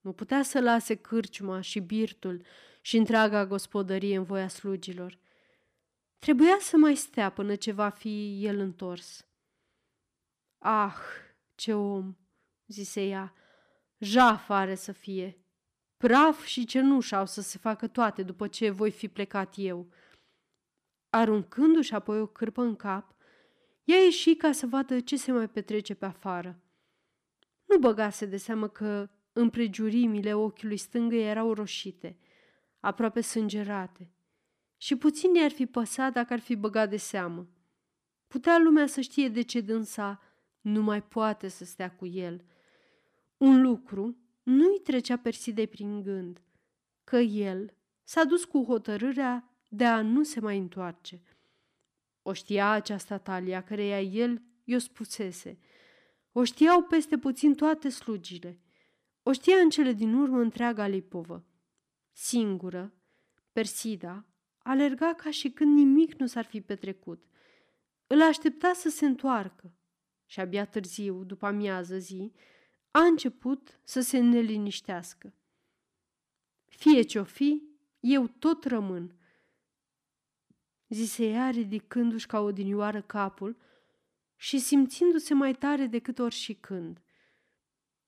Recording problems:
none

